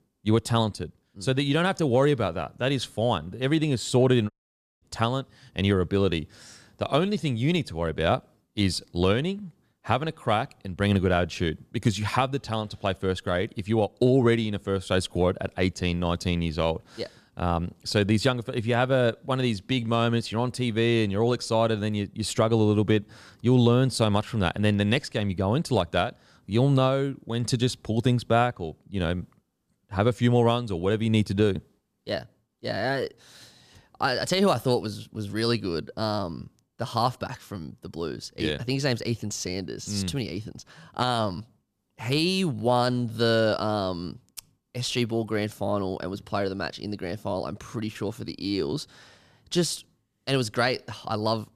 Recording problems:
audio cutting out; at 4.5 s for 0.5 s

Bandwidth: 14.5 kHz